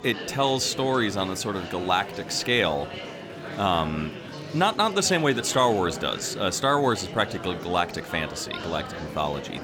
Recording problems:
murmuring crowd; noticeable; throughout; 10 dB below the speech

